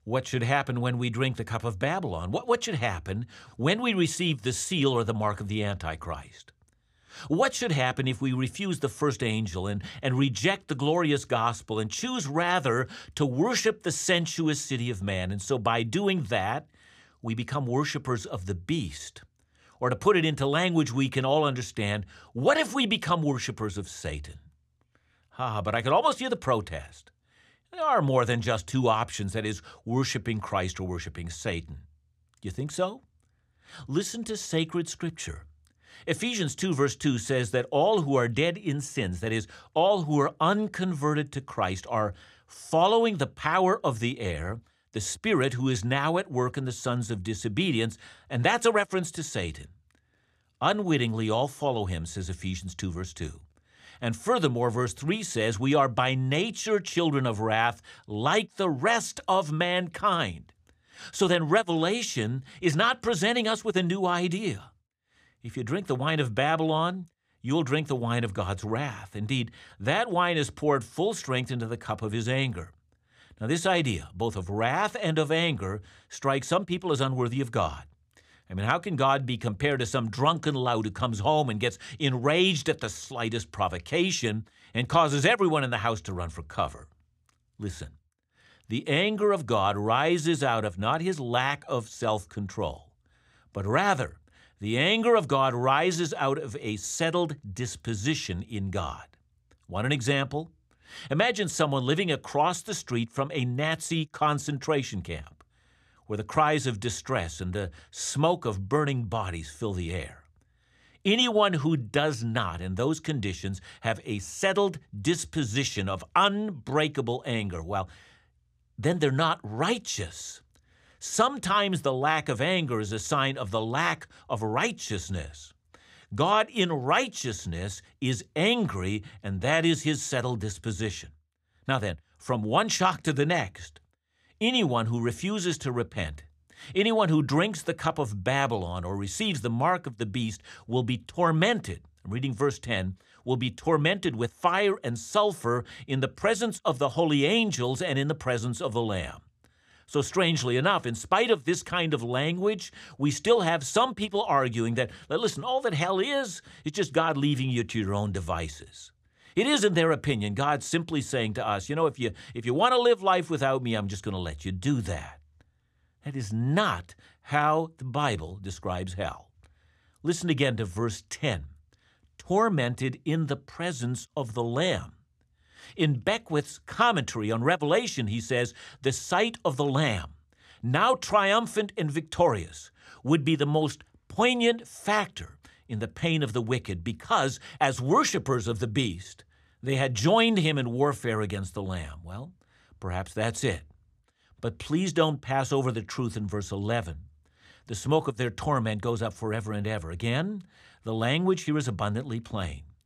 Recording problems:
none

